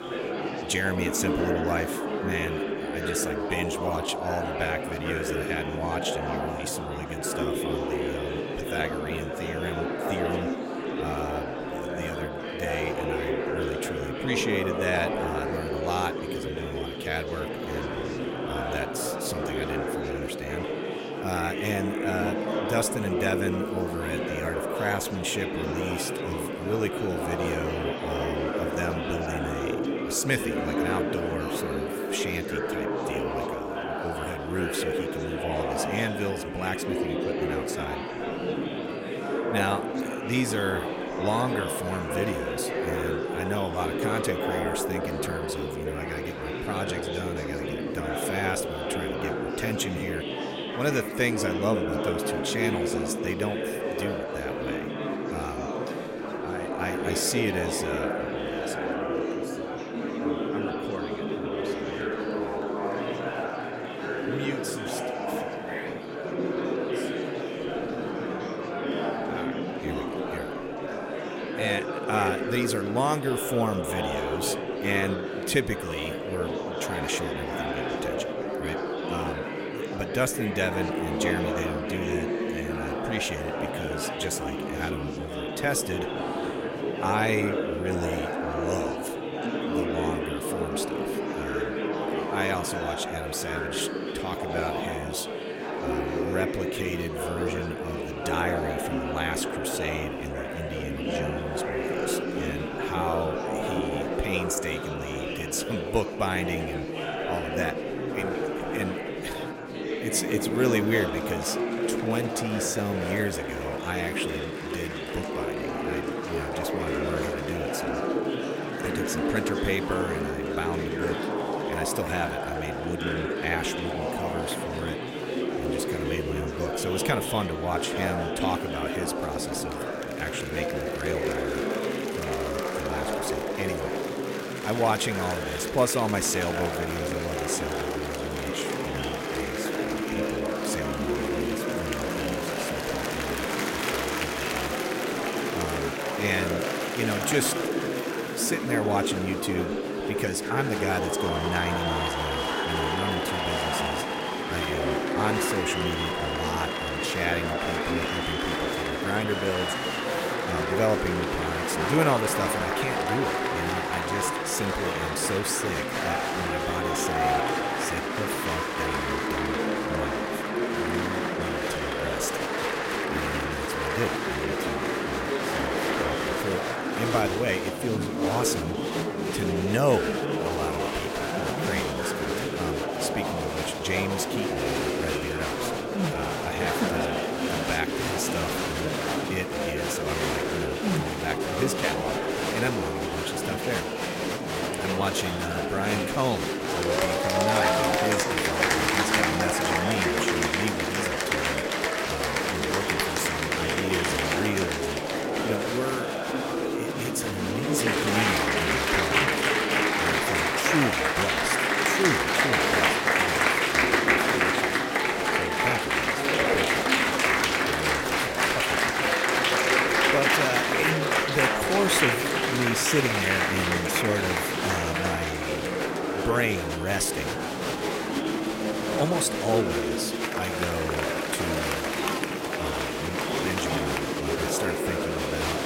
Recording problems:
murmuring crowd; very loud; throughout; 4 dB above the speech

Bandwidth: 16 kHz